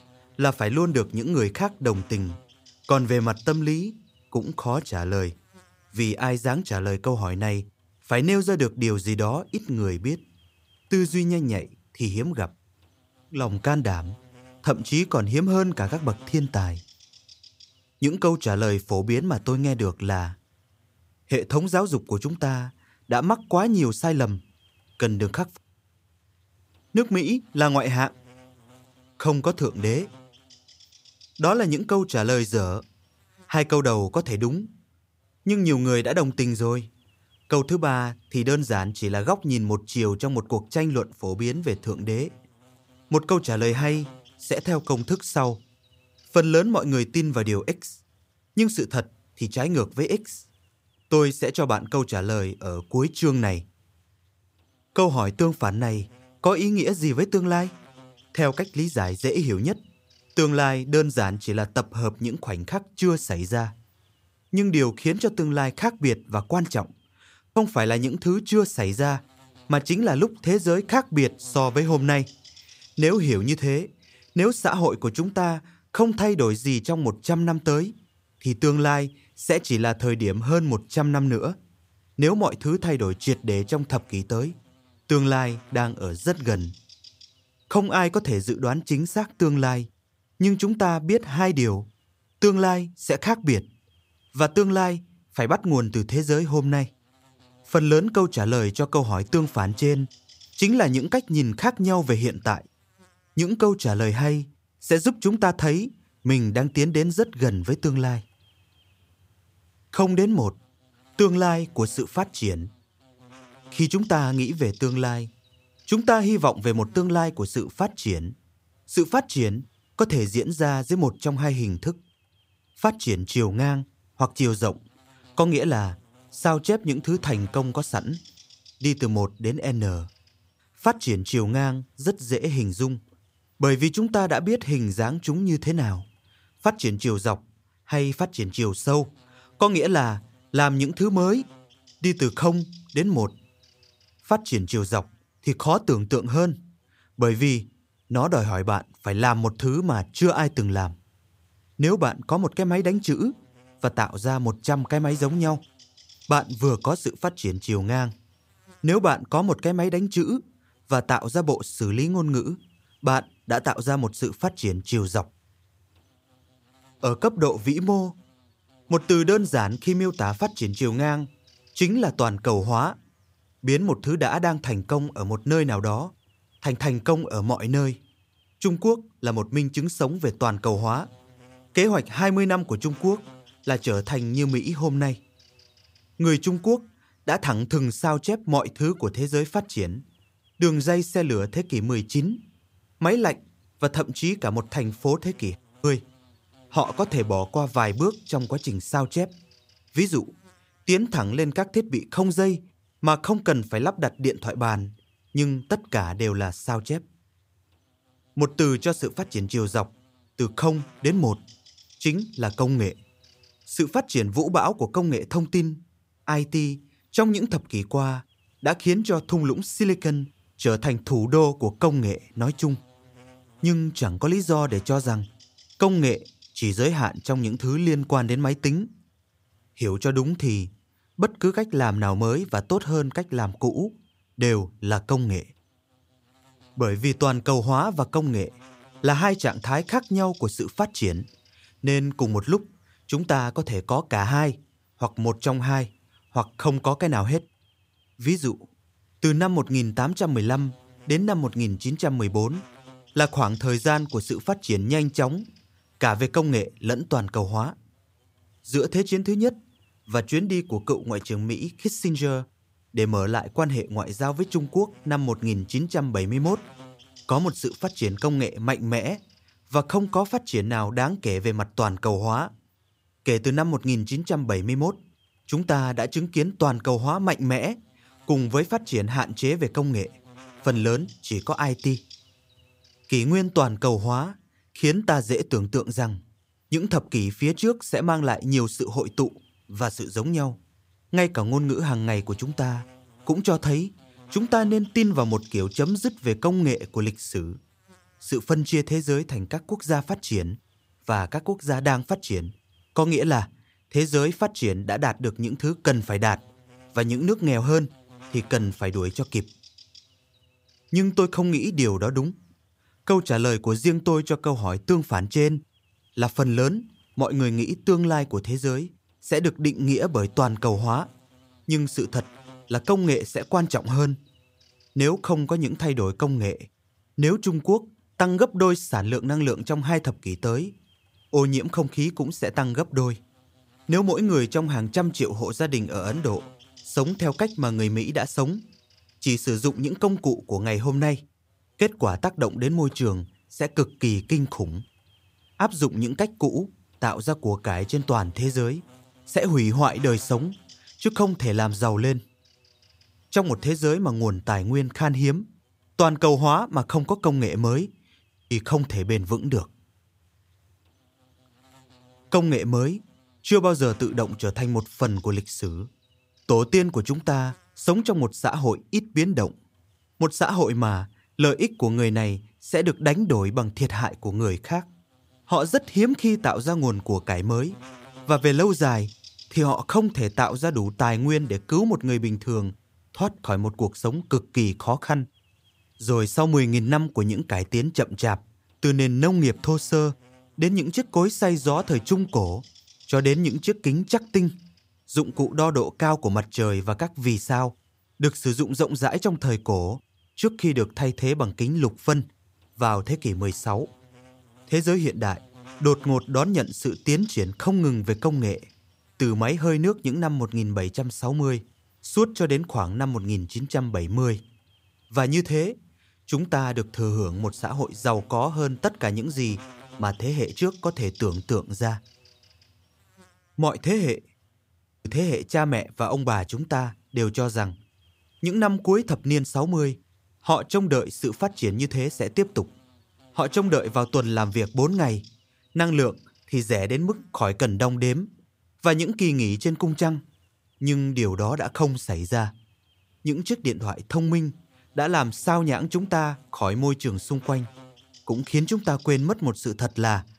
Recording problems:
electrical hum; faint; throughout; 50 Hz, 25 dB below the speech

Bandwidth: 15.5 kHz